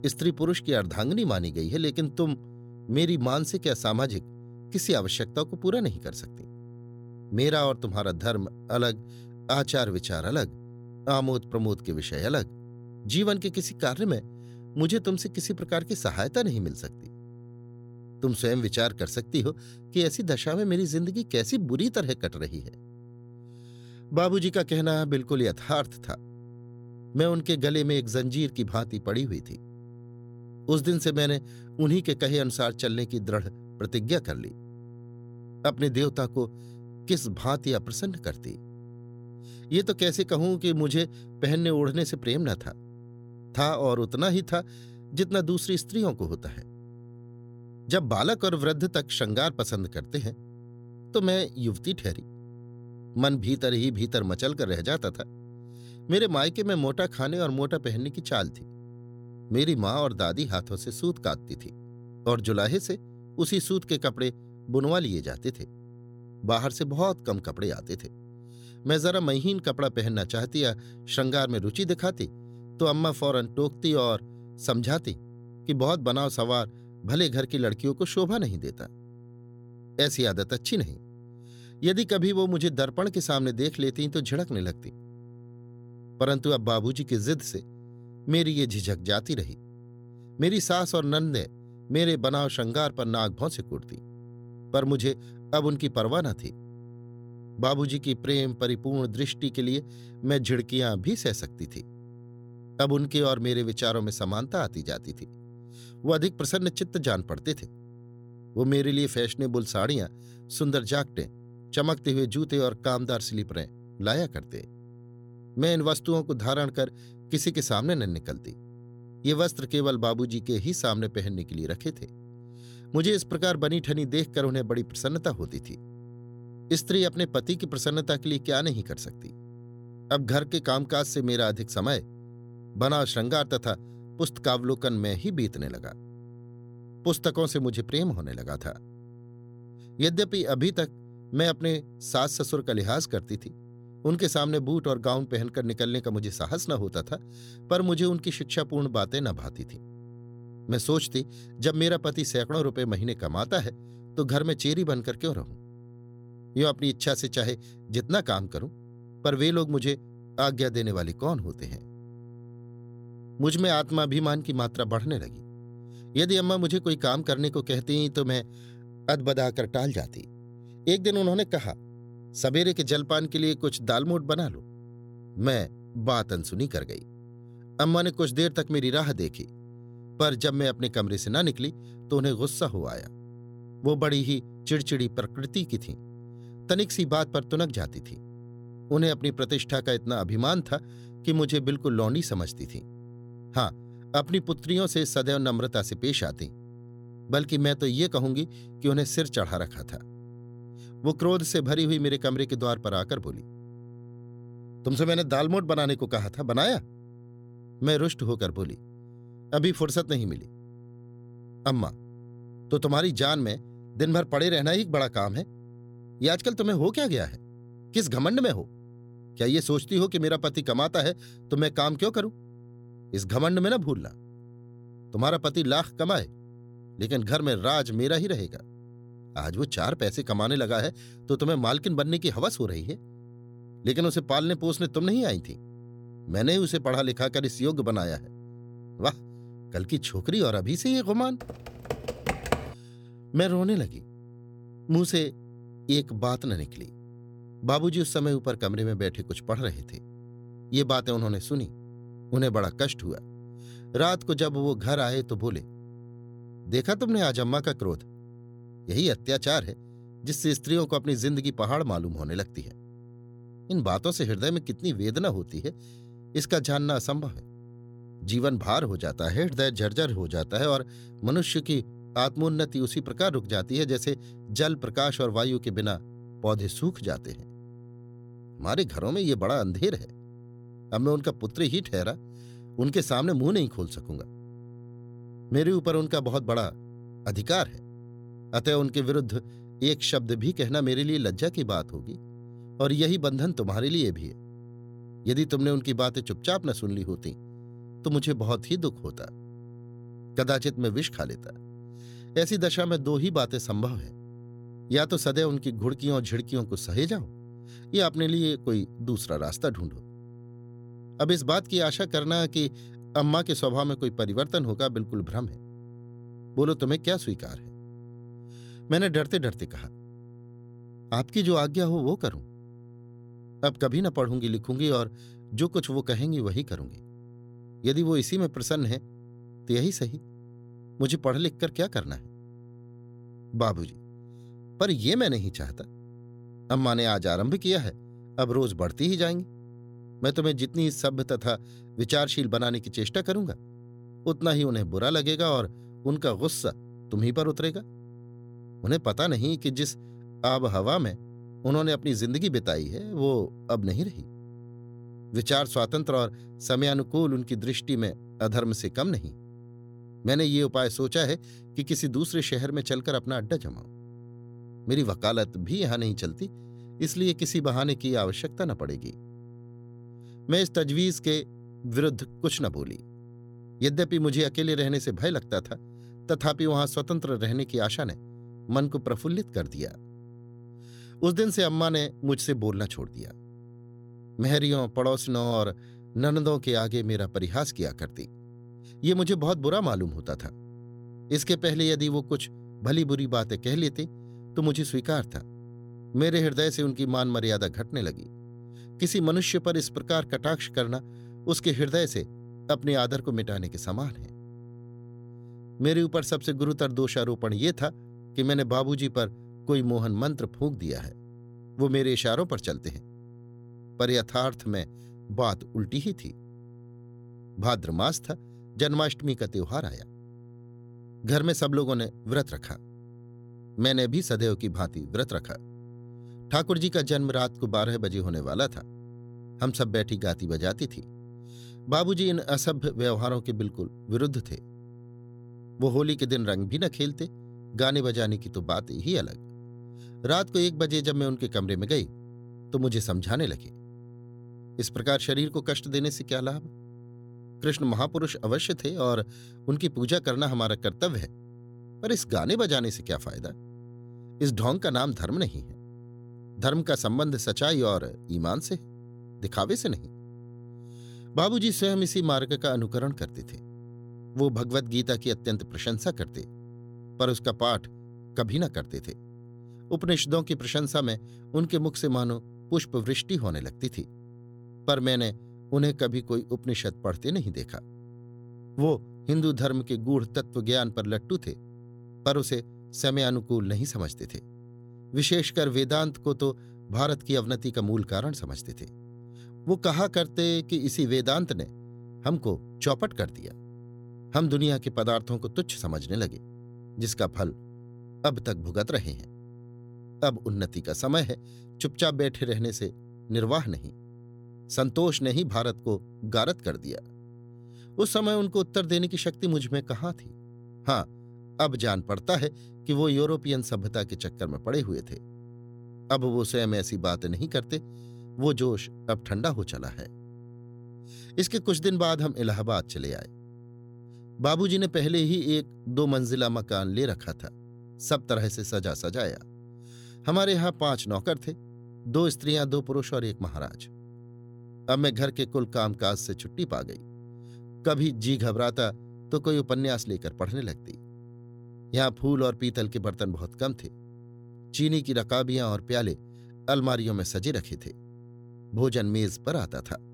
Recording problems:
electrical hum; faint; throughout; 60 Hz, 25 dB below the speech
keyboard typing; noticeable; from 4:01 to 4:03; peak 2 dB below the speech

